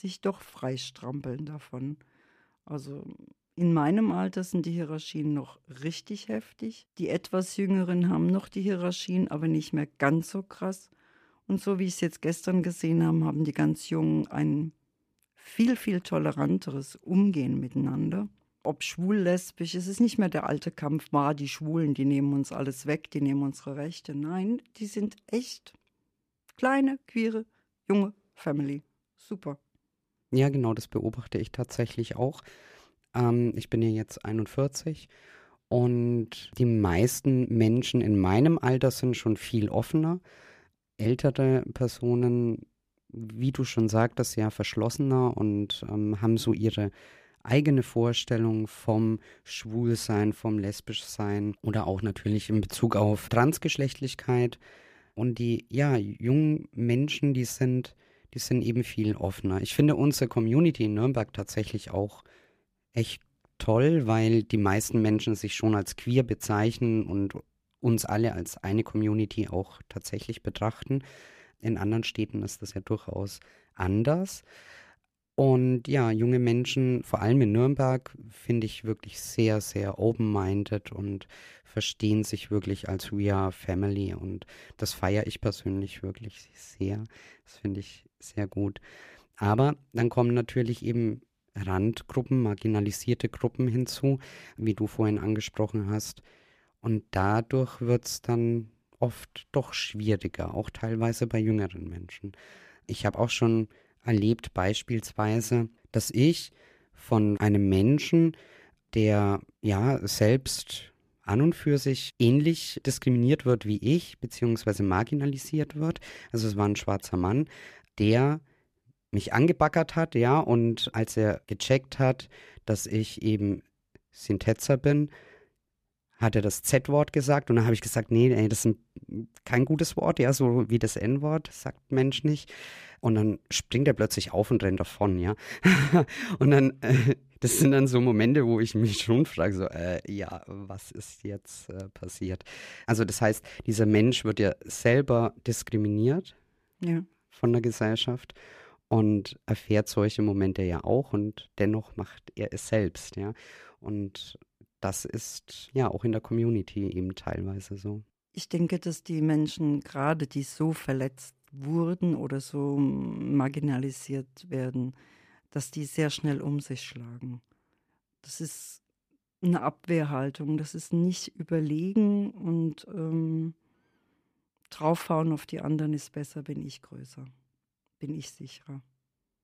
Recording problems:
none

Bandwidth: 15 kHz